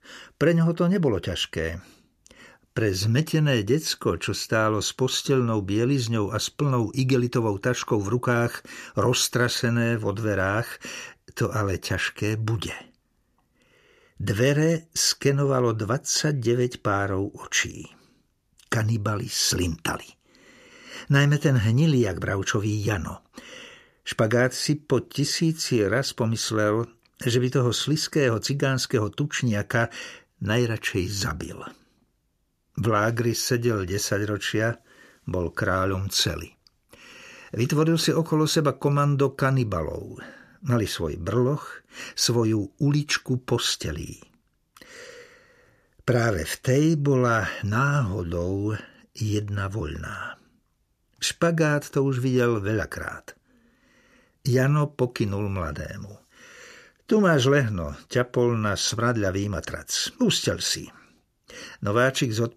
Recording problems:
none

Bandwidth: 14.5 kHz